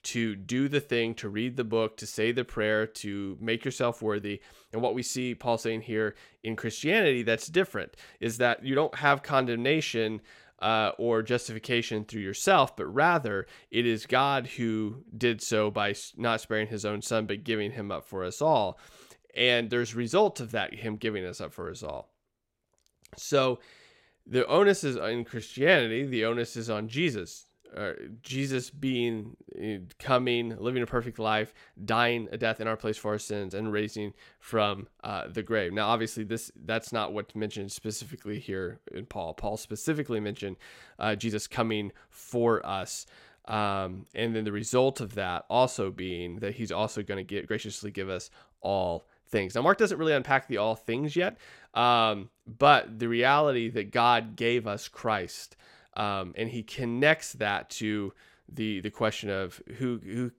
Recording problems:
uneven, jittery; strongly; from 4.5 to 57 s

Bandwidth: 16 kHz